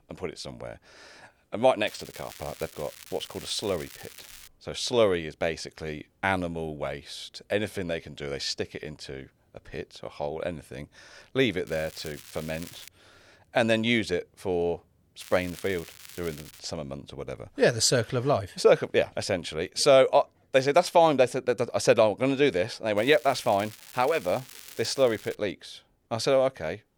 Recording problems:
crackling; noticeable; 4 times, first at 2 s; 20 dB below the speech

